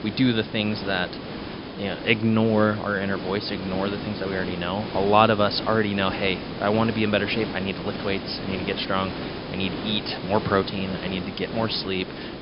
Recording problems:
high frequencies cut off; noticeable; nothing above 5.5 kHz
hiss; loud; throughout; 8 dB below the speech

